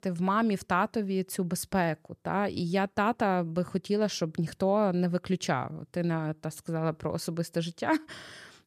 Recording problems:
none

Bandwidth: 14 kHz